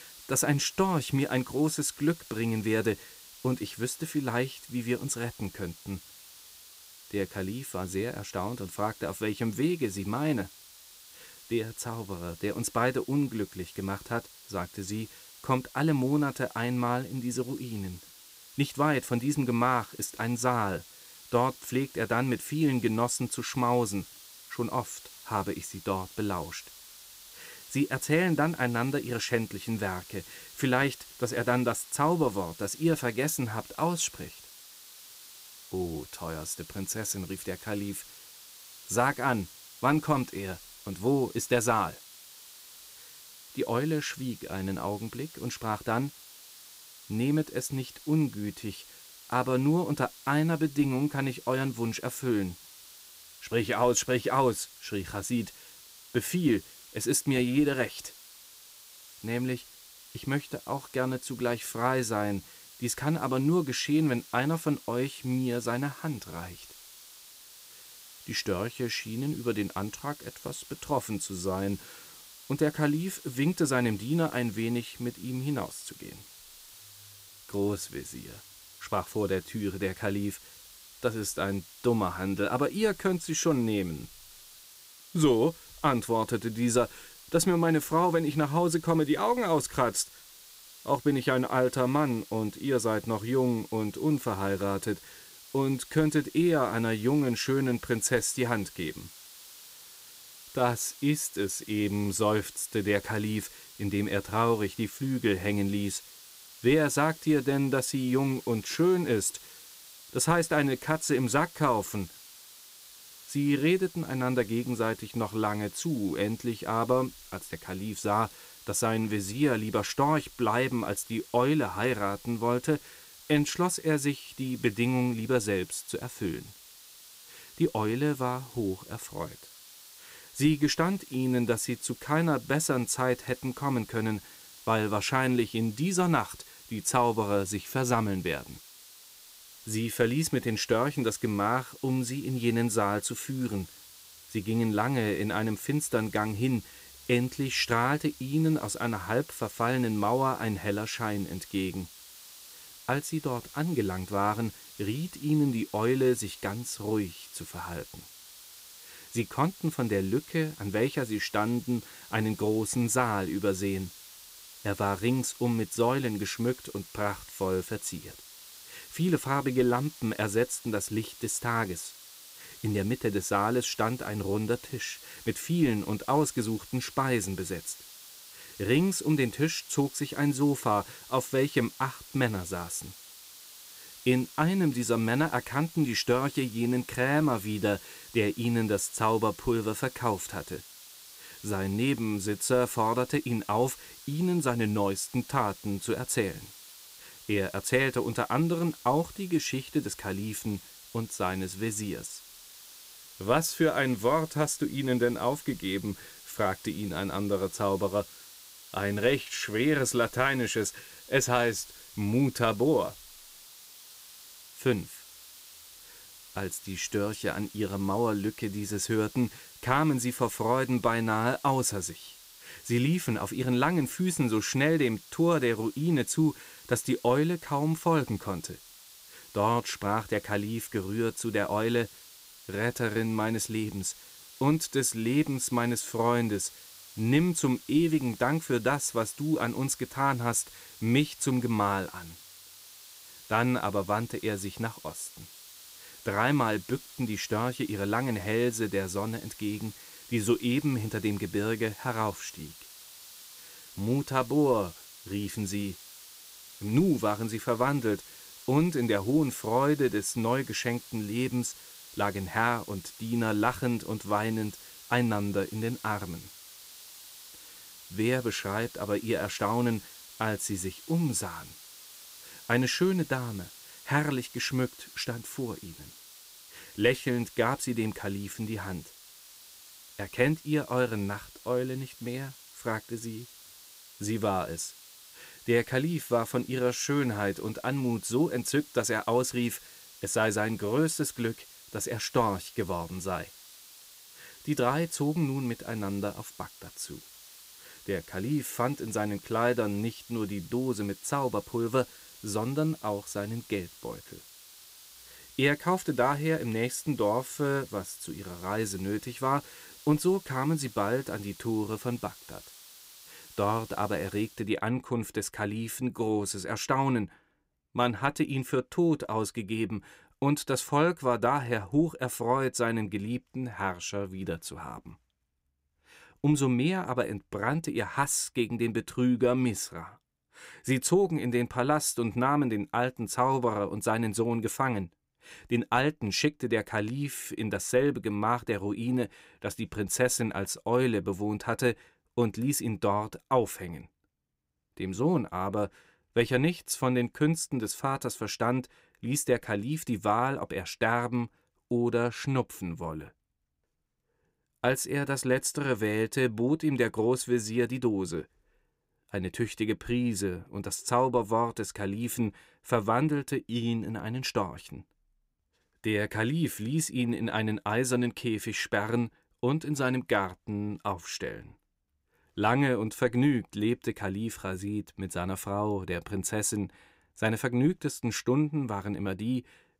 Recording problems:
hiss; noticeable; until 5:14; 20 dB below the speech

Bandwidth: 15.5 kHz